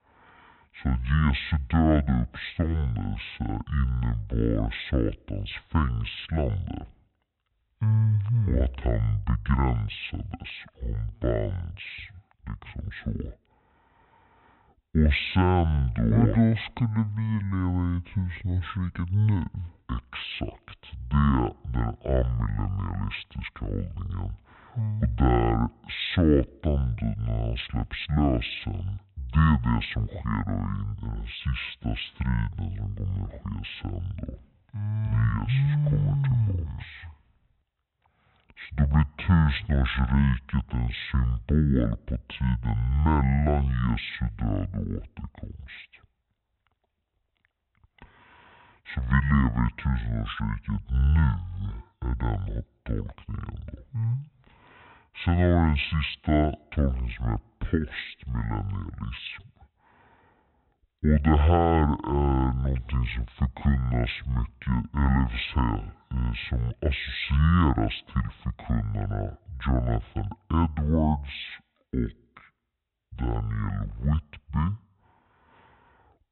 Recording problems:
high frequencies cut off; severe; nothing above 4 kHz
wrong speed and pitch; too slow and too low; 0.5 times normal speed

